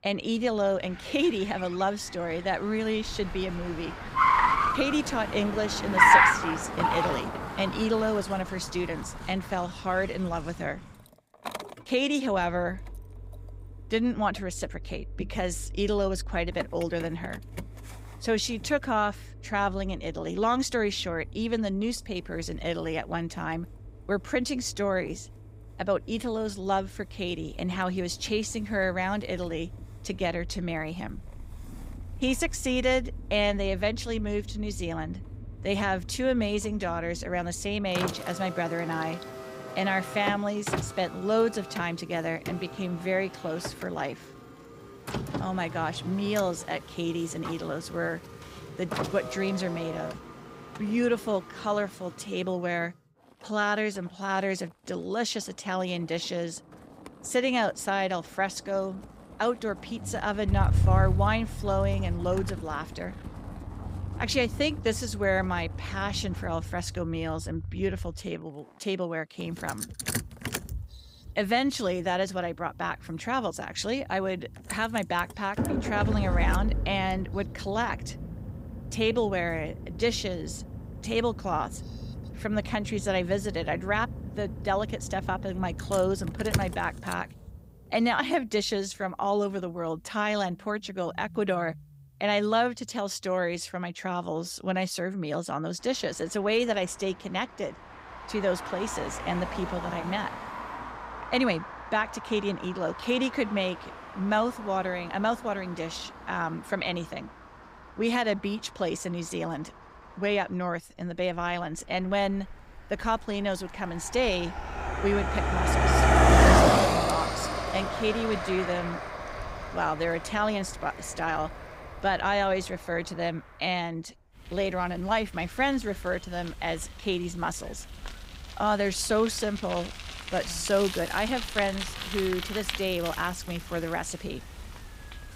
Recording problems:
traffic noise; loud; throughout; 2 dB below the speech

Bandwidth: 15.5 kHz